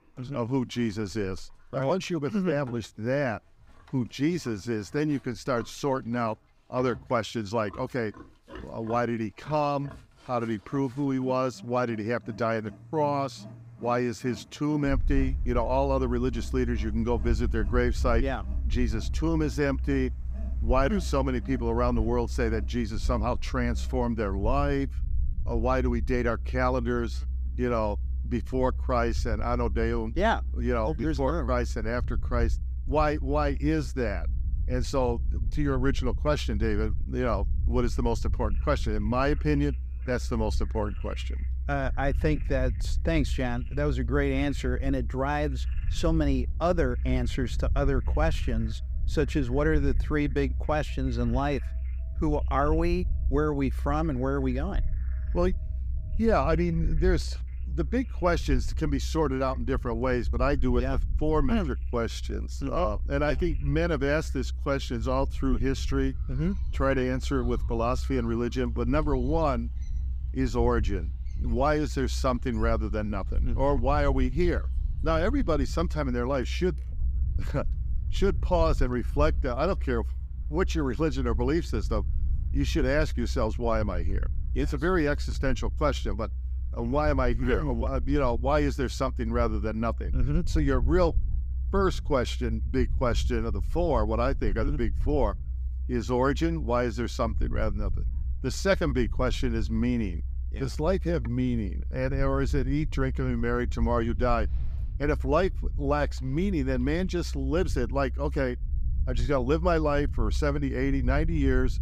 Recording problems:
animal sounds; faint; throughout; 25 dB below the speech
low rumble; faint; from 15 s on; 20 dB below the speech

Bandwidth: 15.5 kHz